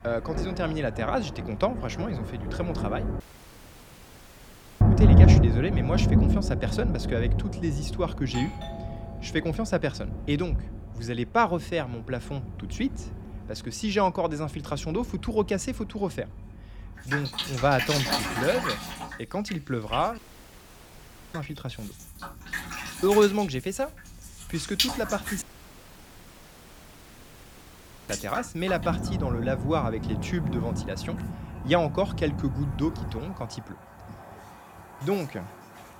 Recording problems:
rain or running water; very loud; throughout; 1 dB above the speech
audio cutting out; at 3 s for 1.5 s, at 20 s for 1 s and at 25 s for 2.5 s
doorbell; noticeable; from 8 to 9.5 s; peak 8 dB below the speech

